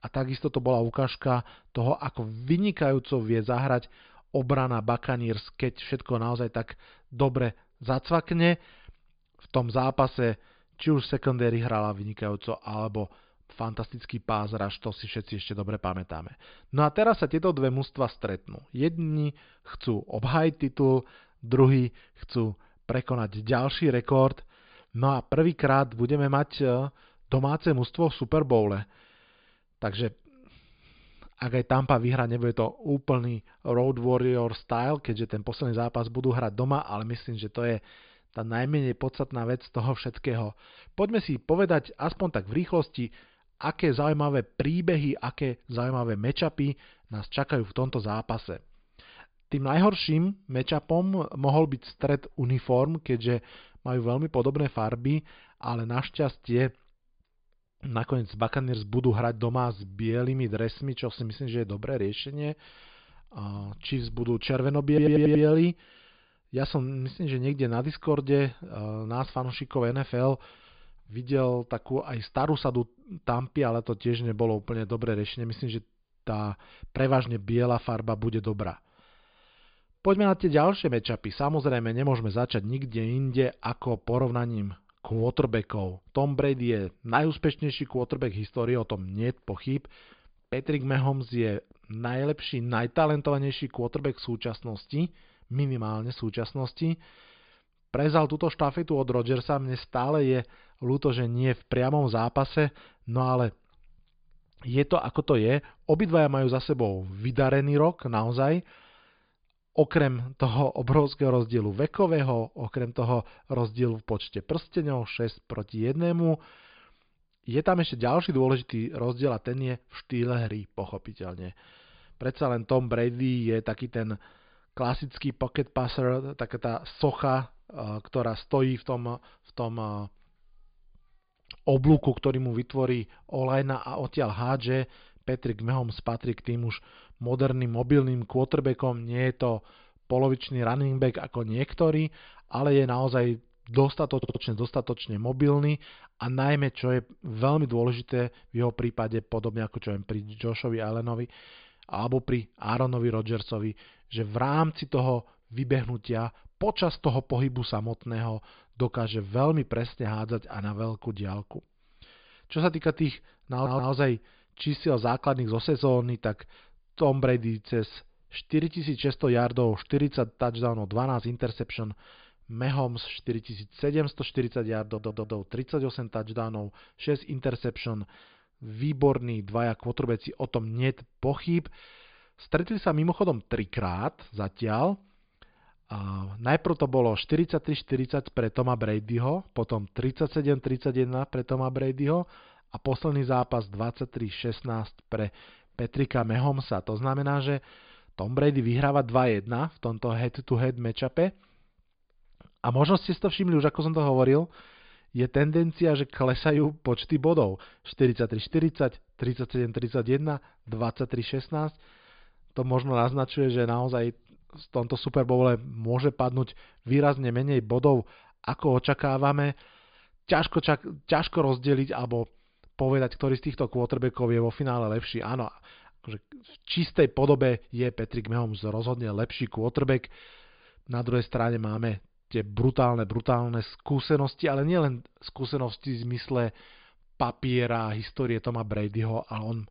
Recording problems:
high frequencies cut off; severe; nothing above 5 kHz
audio stuttering; 4 times, first at 1:05

